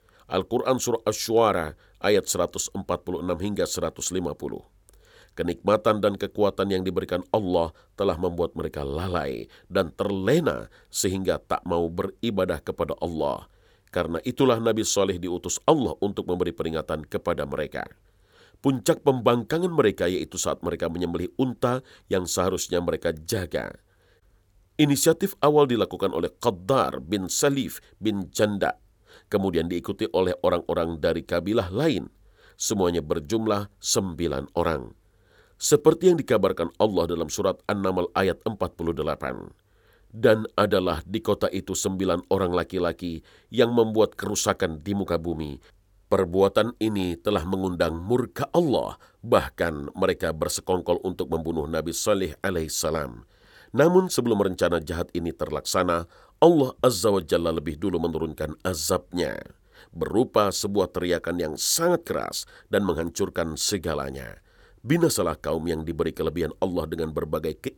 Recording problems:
none

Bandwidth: 17.5 kHz